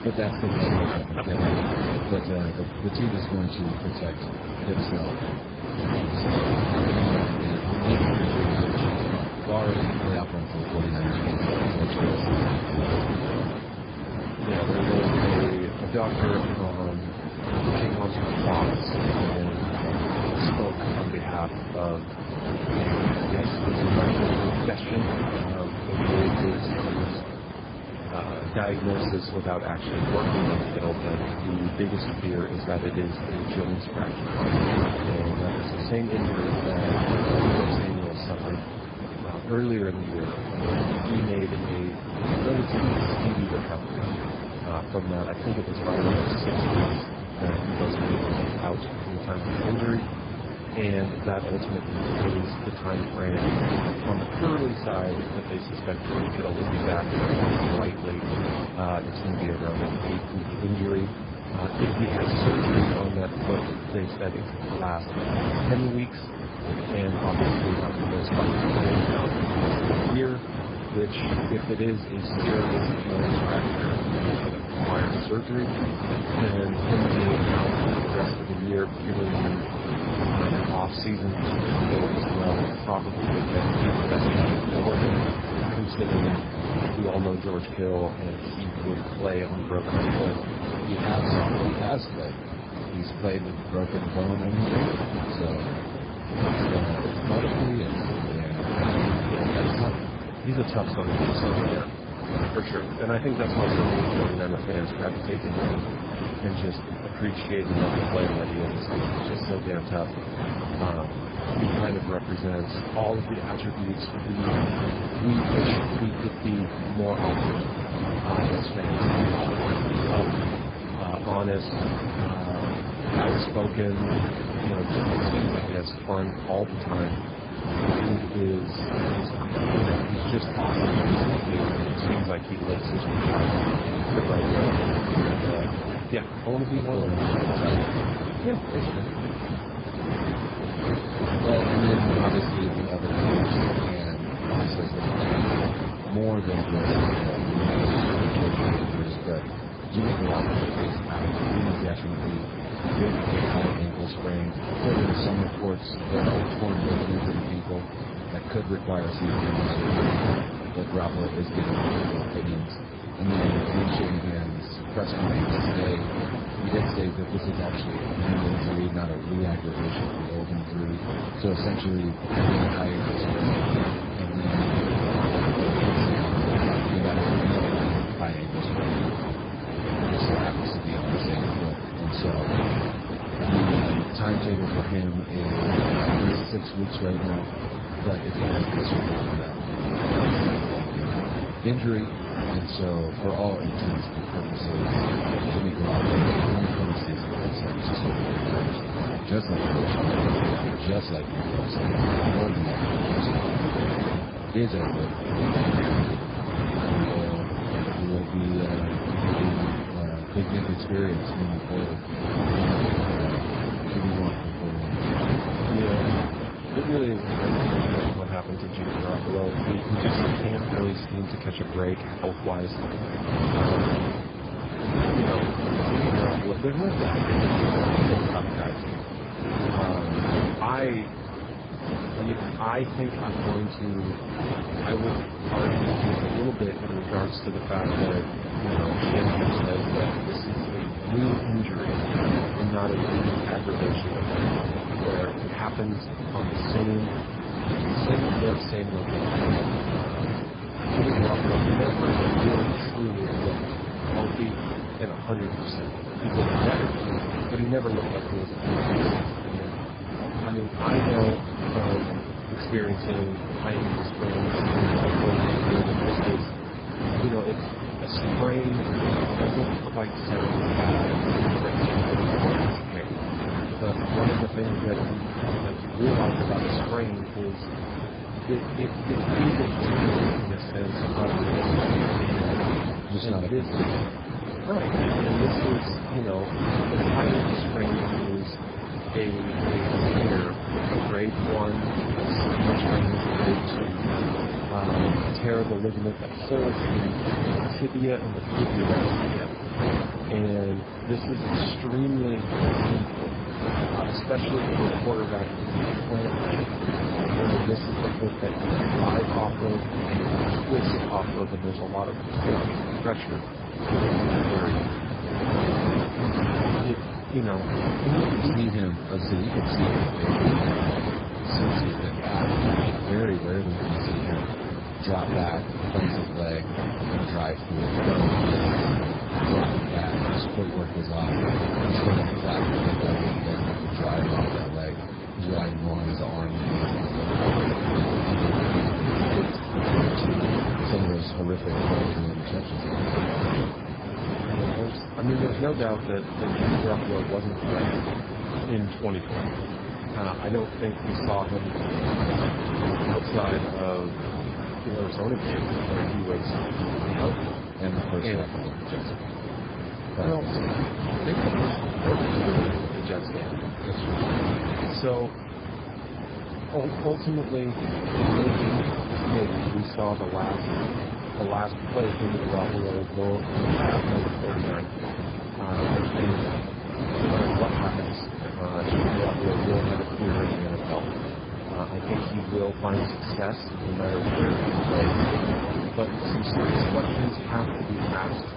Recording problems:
garbled, watery; badly; nothing above 5 kHz
wind noise on the microphone; heavy; 3 dB above the speech

